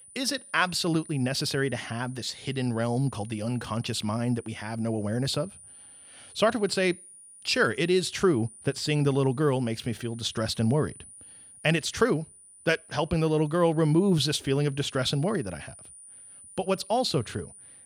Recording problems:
high-pitched whine; noticeable; throughout; 9.5 kHz, 20 dB below the speech

